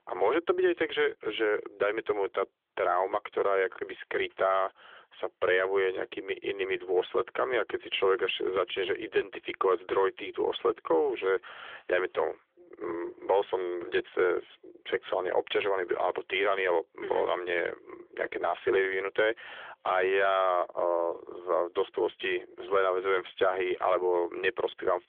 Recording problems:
phone-call audio; nothing above 3.5 kHz

